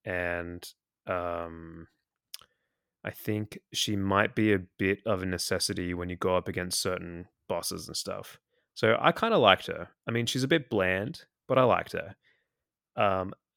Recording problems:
none

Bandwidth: 17 kHz